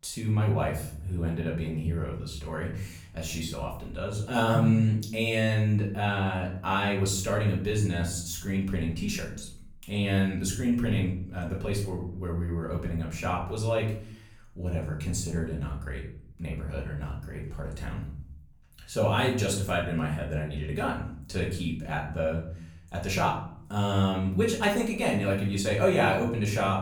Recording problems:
off-mic speech; far
room echo; slight; dies away in 0.5 s

